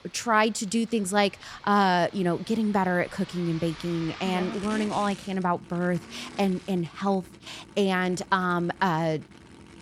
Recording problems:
traffic noise; noticeable; throughout; 20 dB below the speech

